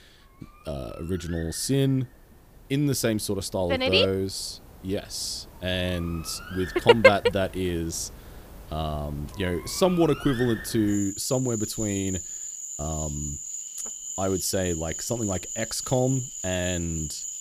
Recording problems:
animal sounds; loud; throughout; 9 dB below the speech

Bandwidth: 15 kHz